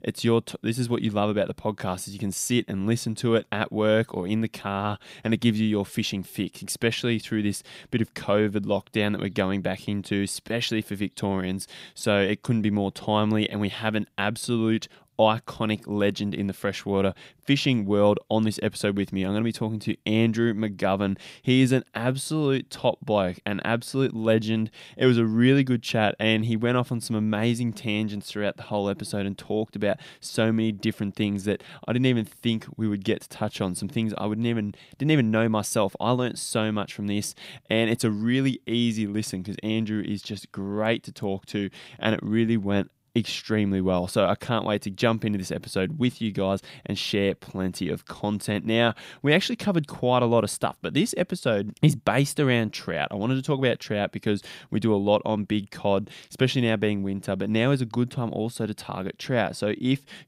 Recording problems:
none

